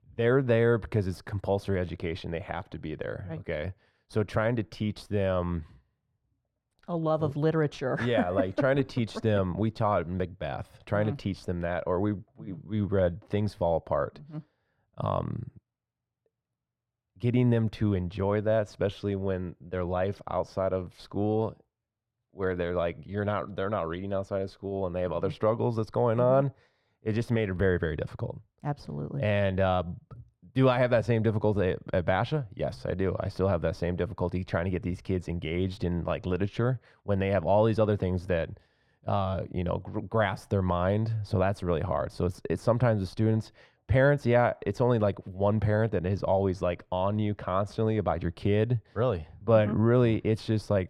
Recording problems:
muffled; very; fading above 3 kHz

